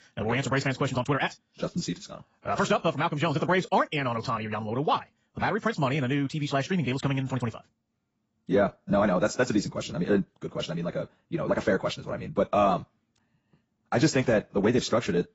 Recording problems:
garbled, watery; badly; nothing above 7.5 kHz
wrong speed, natural pitch; too fast; 1.8 times normal speed

